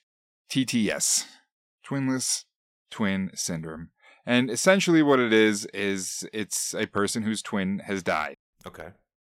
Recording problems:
none

